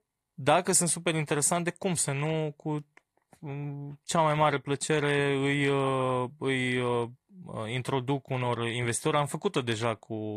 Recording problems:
garbled, watery; slightly
abrupt cut into speech; at the end

